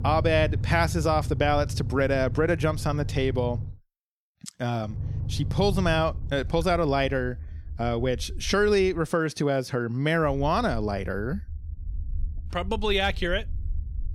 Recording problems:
low rumble; faint; until 3.5 s, from 5 to 9 s and from 10 s on; 20 dB below the speech

